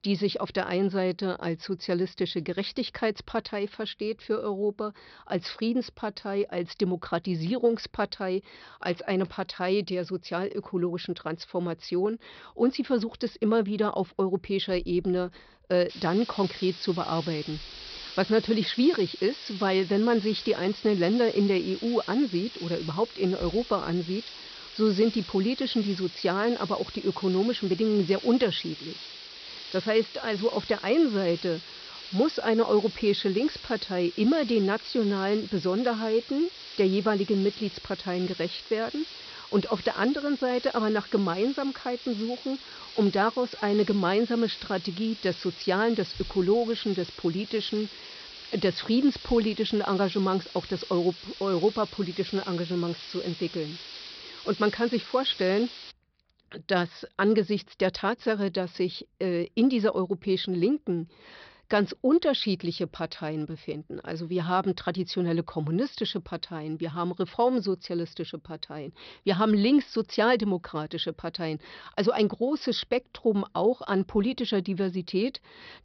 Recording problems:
high frequencies cut off; noticeable; nothing above 5.5 kHz
hiss; noticeable; from 16 to 56 s; 15 dB below the speech

